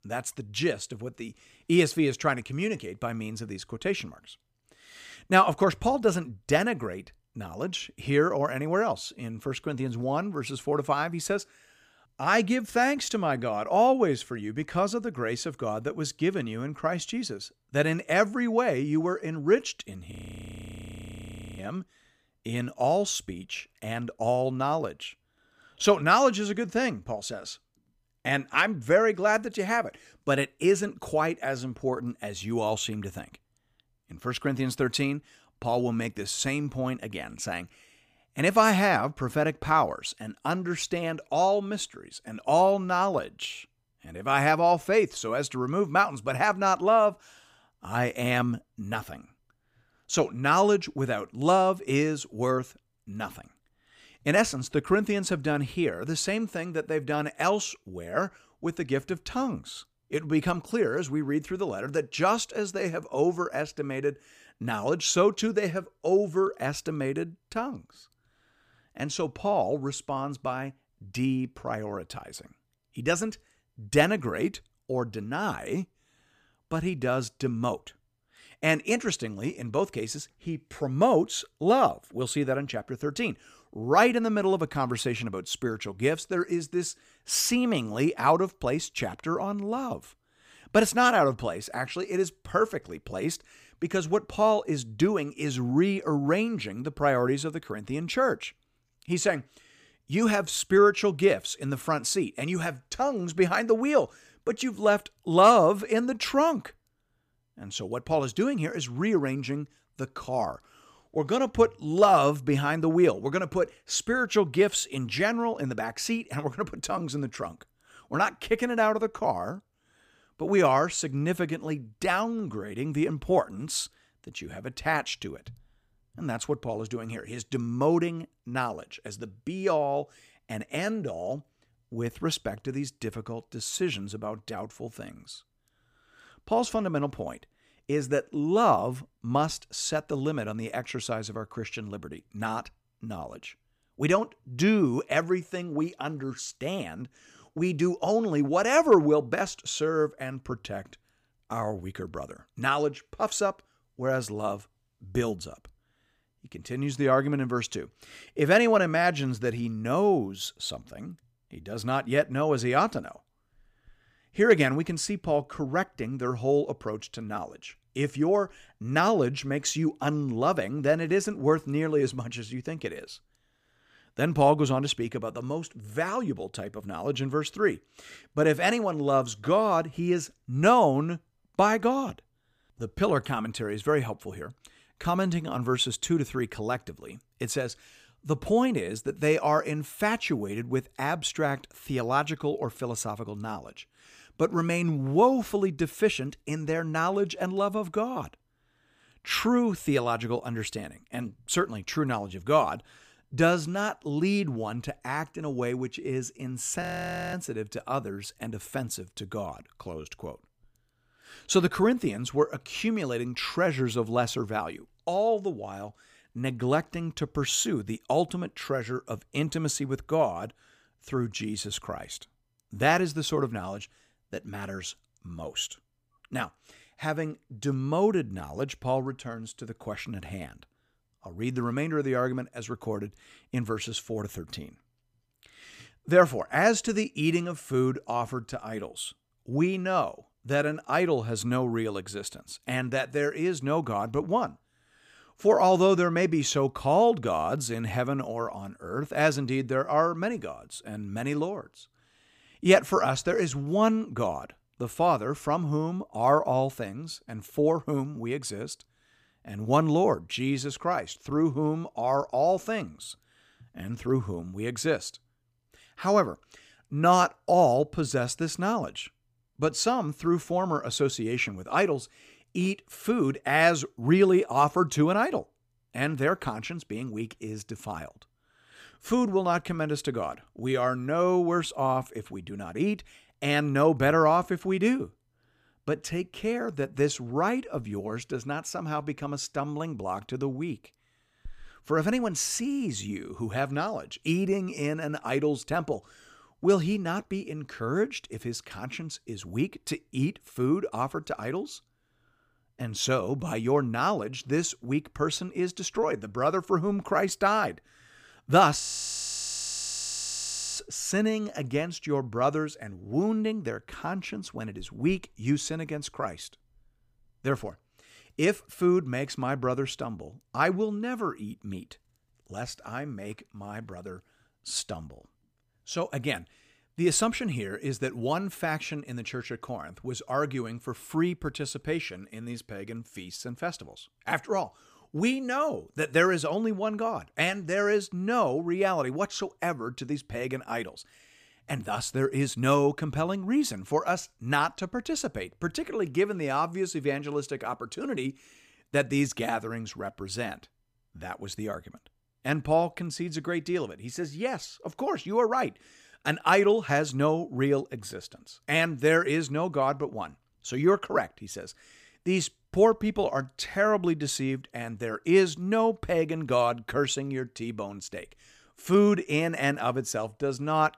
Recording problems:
audio freezing; at 20 s for 1.5 s, at 3:27 for 0.5 s and at 5:09 for 2 s

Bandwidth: 15 kHz